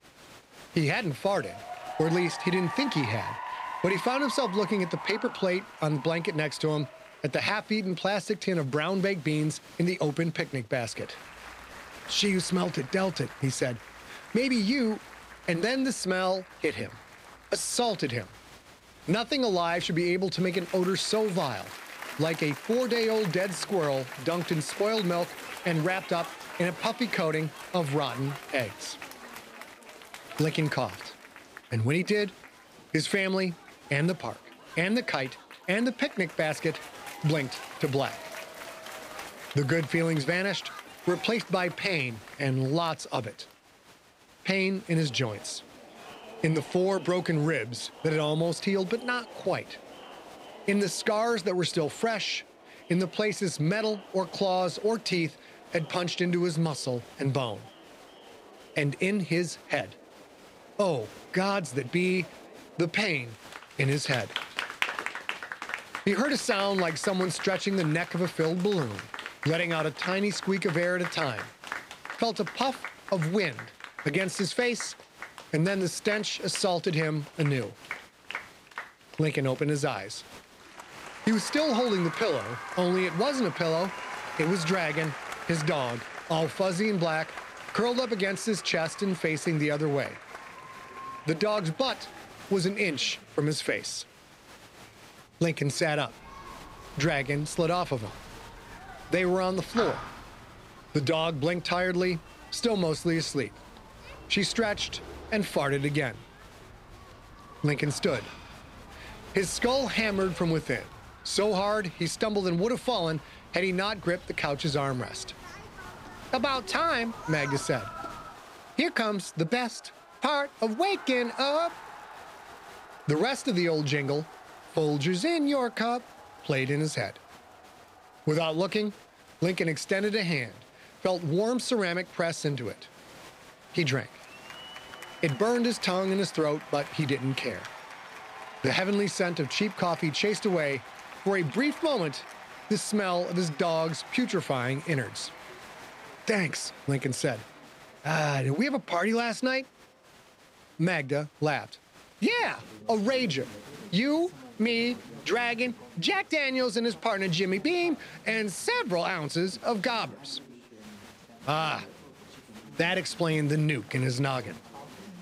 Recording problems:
crowd noise; noticeable; throughout; 15 dB below the speech

